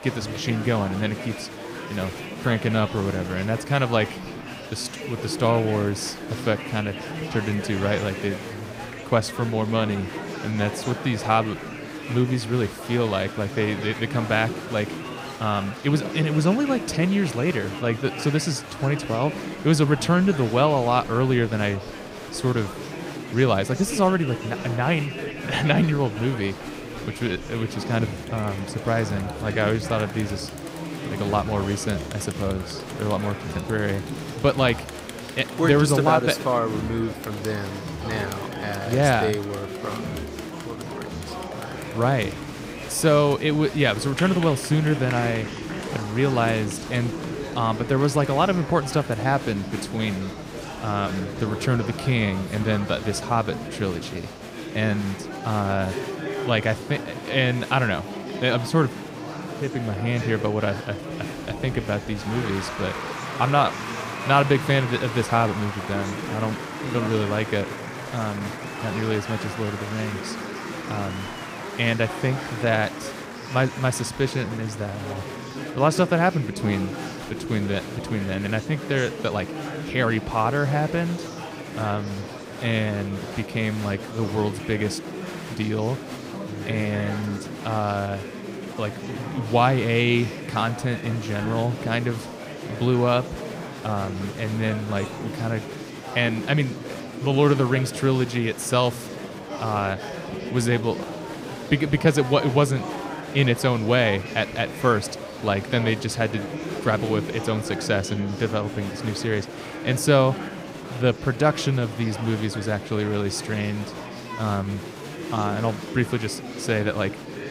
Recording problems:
murmuring crowd; loud; throughout; 9 dB below the speech

